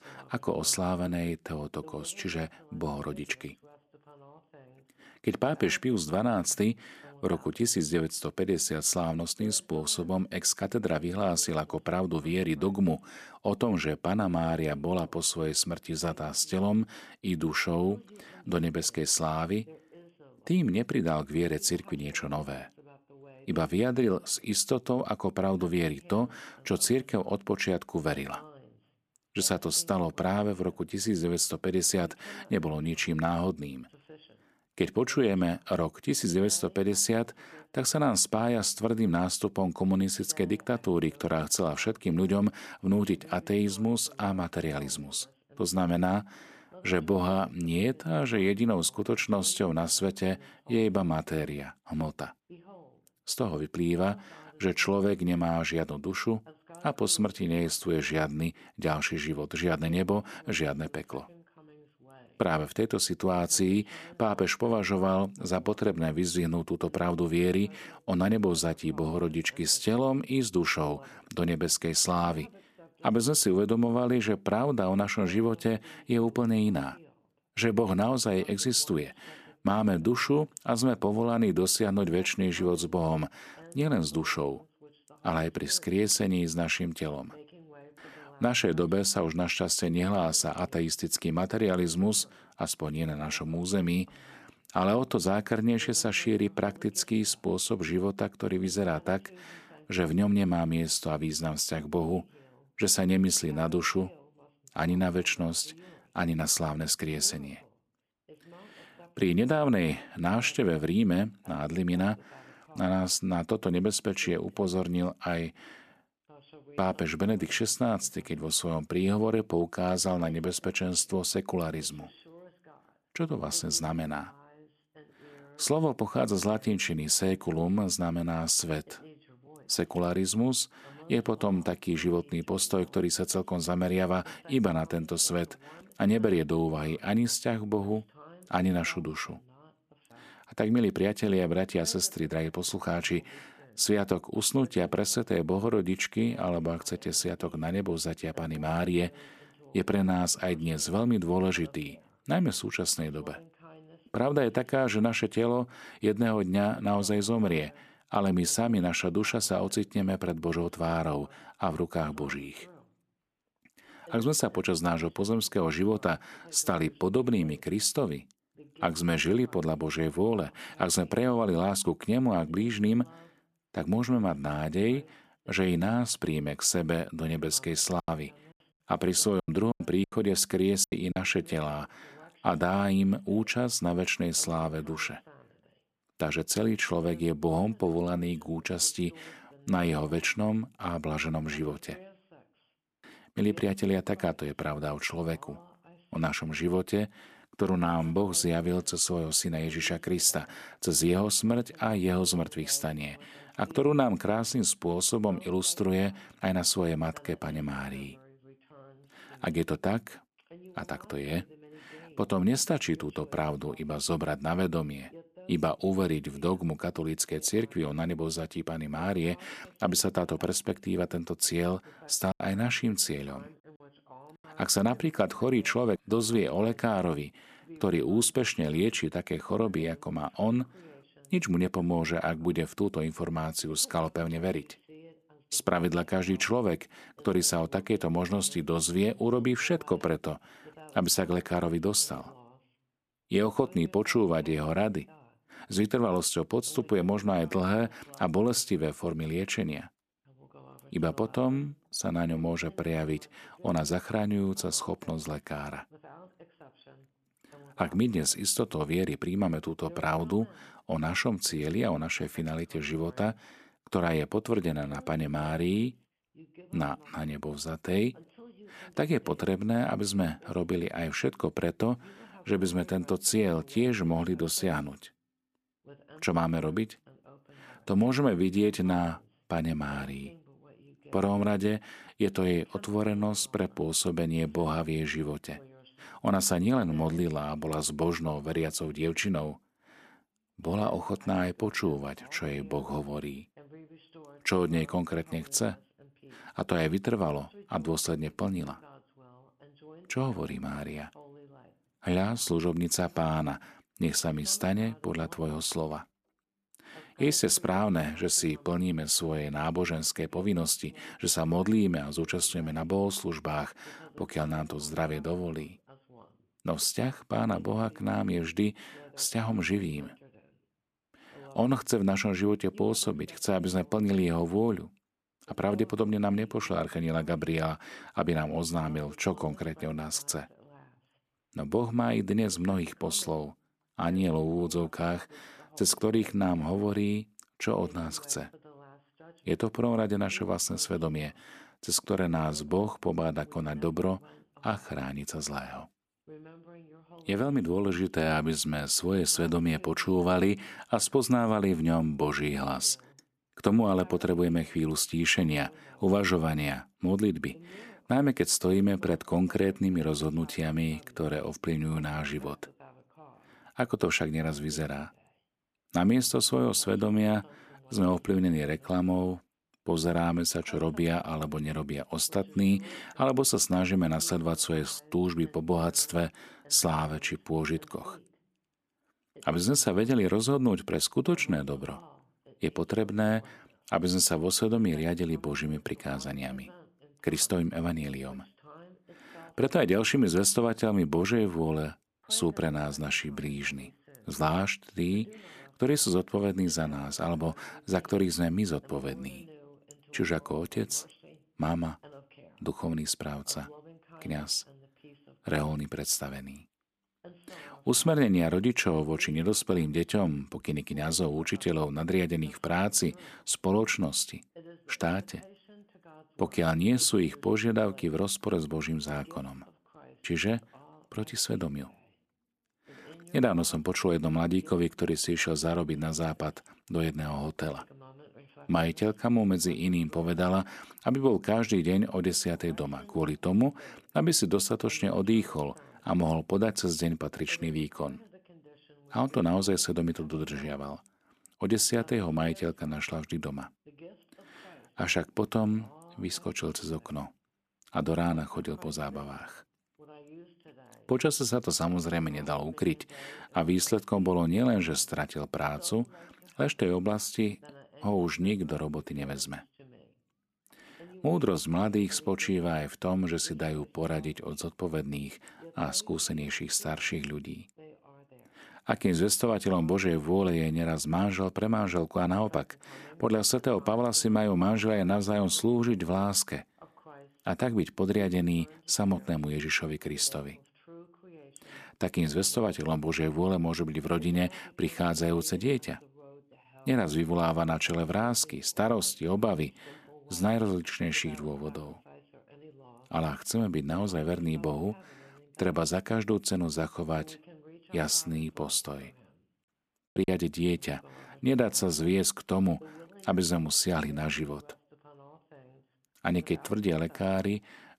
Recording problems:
voice in the background; faint; throughout; 25 dB below the speech
choppy; very; from 2:58 to 3:01, at 3:42 and at 8:20; 12% of the speech affected

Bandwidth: 14.5 kHz